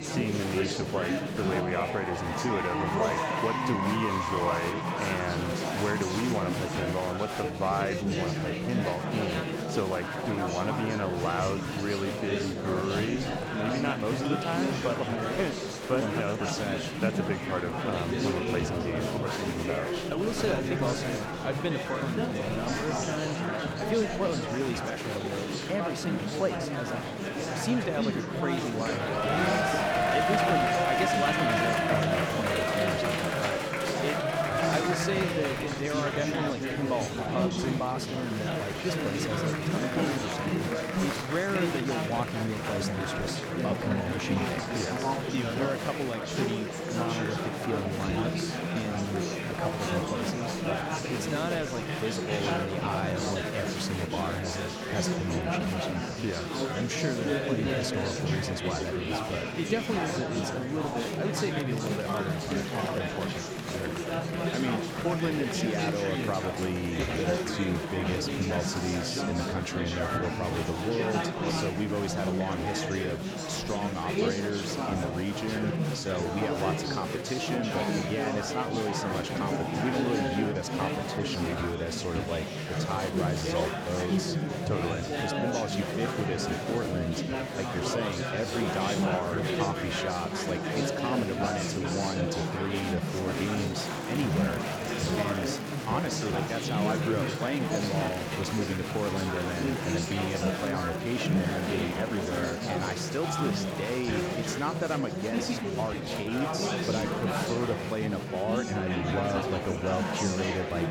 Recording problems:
murmuring crowd; very loud; throughout; 3 dB above the speech

